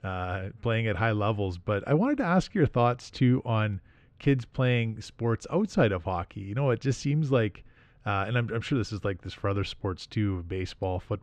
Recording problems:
muffled; slightly; fading above 3 kHz

